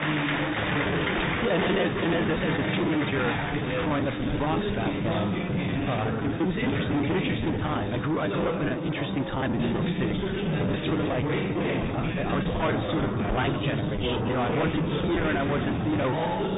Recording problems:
distortion; heavy; 7 dB below the speech
garbled, watery; badly
high frequencies cut off; severe; nothing above 3.5 kHz
chatter from many people; loud; throughout; as loud as the speech
choppy; very; 16% of the speech affected

